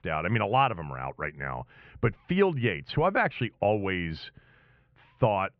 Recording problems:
muffled; very; fading above 3 kHz

